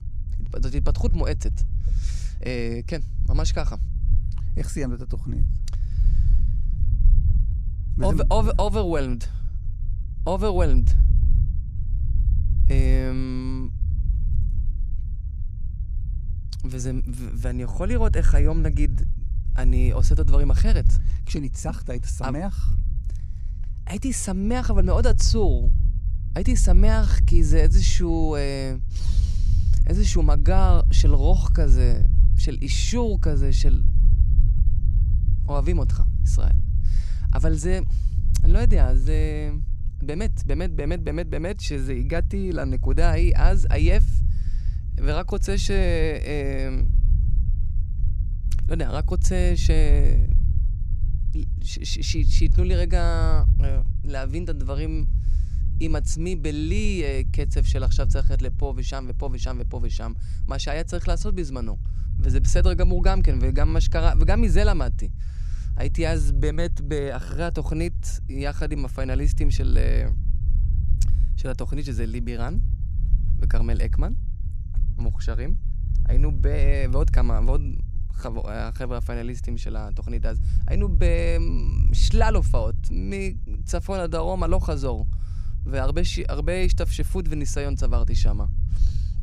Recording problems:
low rumble; noticeable; throughout; 15 dB below the speech

